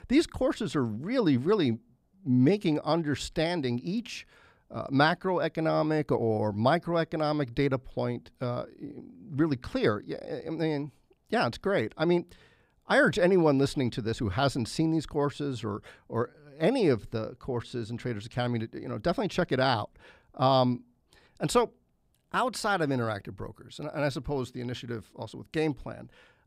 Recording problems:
none

